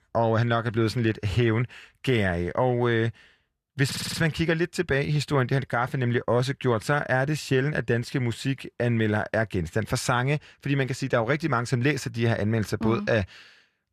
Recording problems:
audio stuttering; at 4 s

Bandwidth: 14.5 kHz